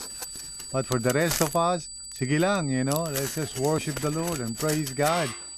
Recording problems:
high-pitched whine; loud; throughout; 8 kHz, 10 dB below the speech
household noises; loud; throughout; 7 dB below the speech

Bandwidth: 13.5 kHz